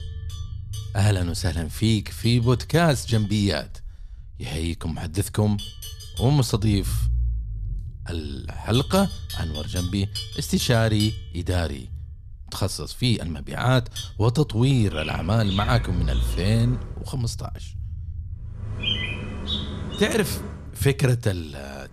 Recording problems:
animal sounds; noticeable; throughout; 10 dB below the speech
low rumble; faint; throughout; 25 dB below the speech

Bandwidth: 14.5 kHz